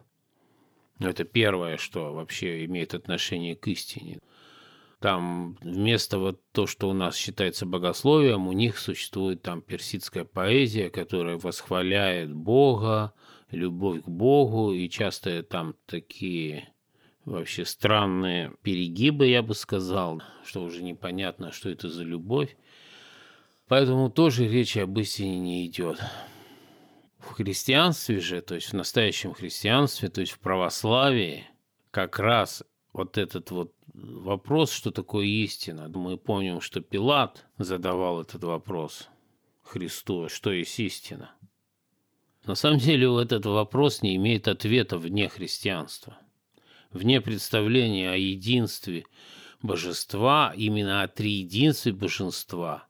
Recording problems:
none

